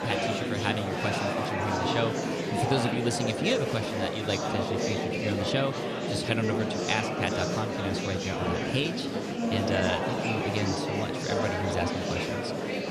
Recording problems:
murmuring crowd; very loud; throughout; 2 dB above the speech

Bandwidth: 14.5 kHz